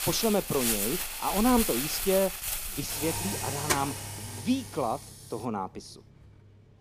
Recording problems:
household noises; loud; throughout; 1 dB below the speech

